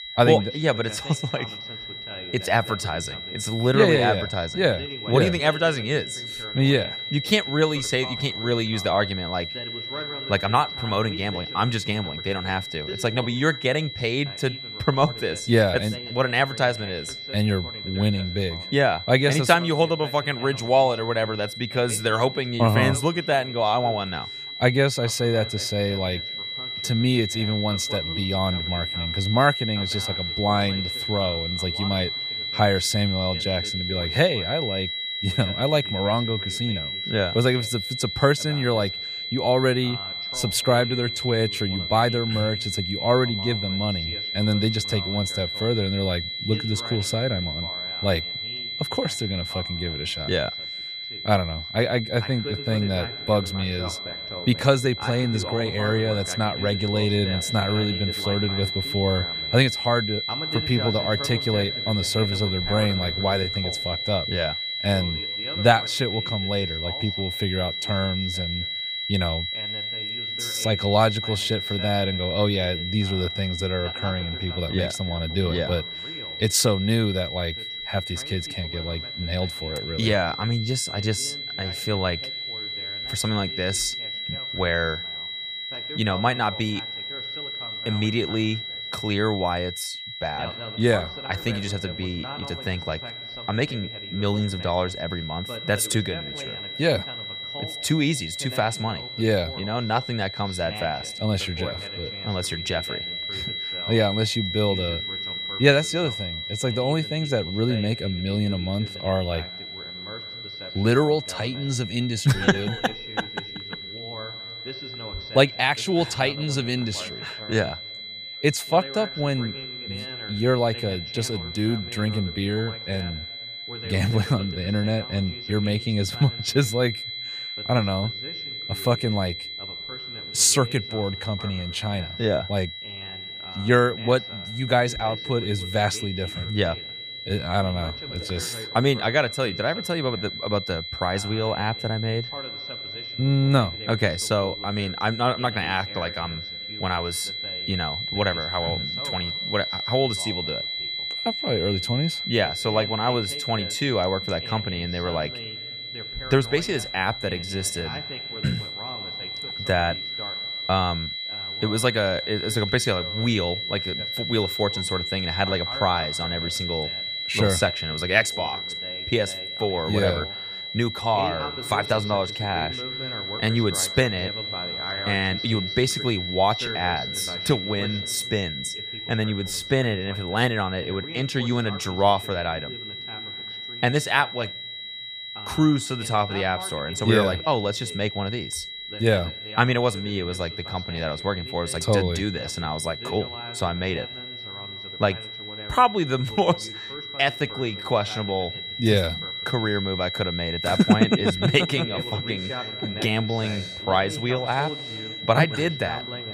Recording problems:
high-pitched whine; loud; throughout; 4 kHz, 5 dB below the speech
voice in the background; noticeable; throughout; 15 dB below the speech

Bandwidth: 15 kHz